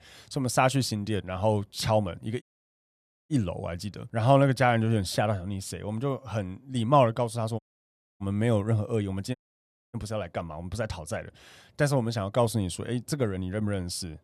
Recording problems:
audio cutting out; at 2.5 s for 1 s, at 7.5 s for 0.5 s and at 9.5 s for 0.5 s

